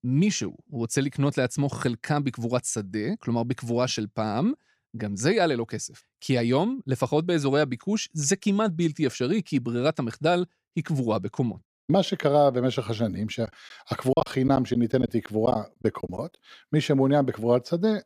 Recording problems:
choppy; very; from 13 to 16 s; 12% of the speech affected

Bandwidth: 15 kHz